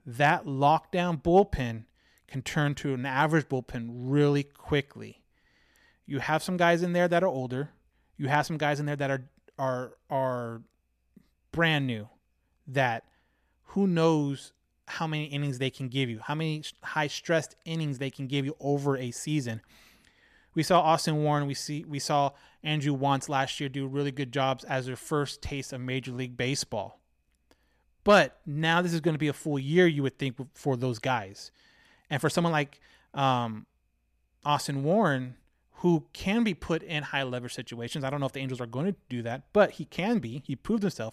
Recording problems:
none

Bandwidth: 14.5 kHz